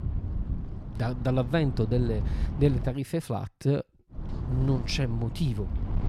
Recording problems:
wind noise on the microphone; occasional gusts; until 3 s and from 4 s on; 15 dB below the speech

